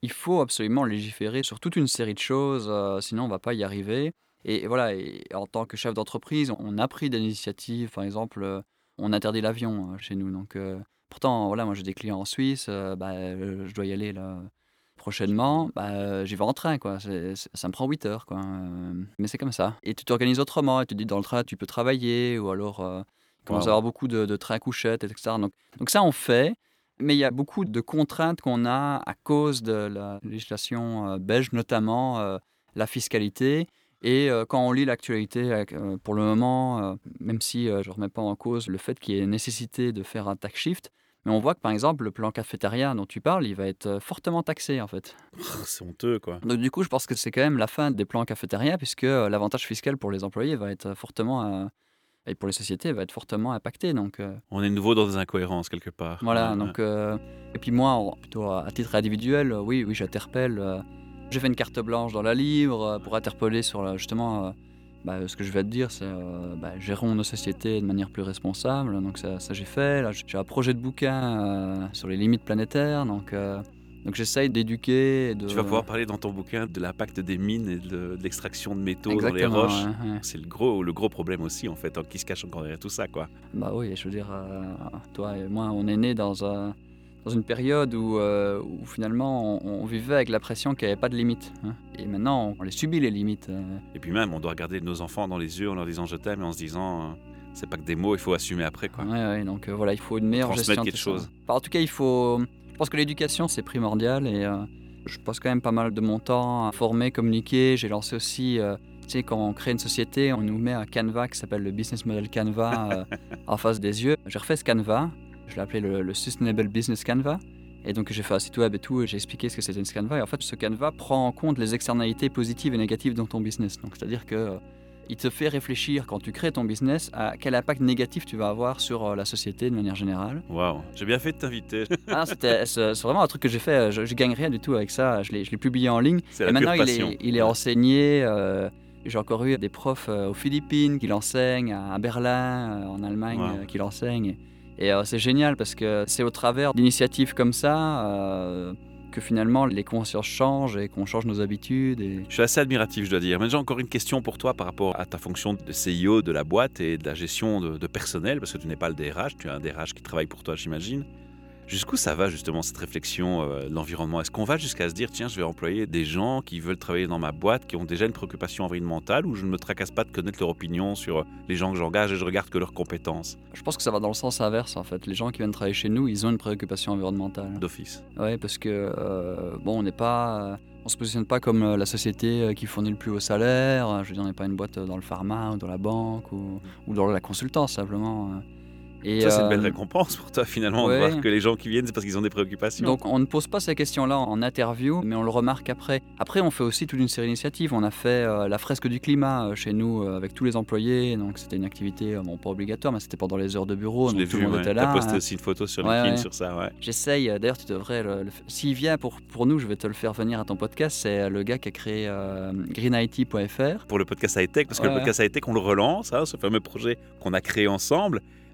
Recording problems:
electrical hum; faint; from 57 s on; 60 Hz, 25 dB below the speech

